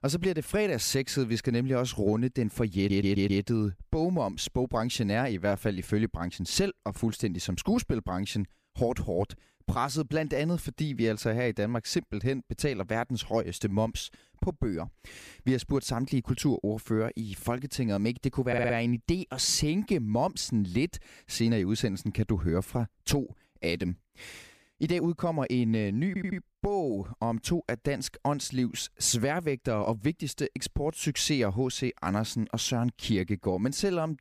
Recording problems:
audio stuttering; at 3 s, at 18 s and at 26 s

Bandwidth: 15 kHz